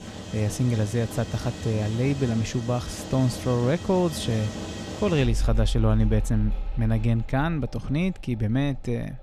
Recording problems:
machinery noise; loud; throughout; 8 dB below the speech

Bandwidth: 15 kHz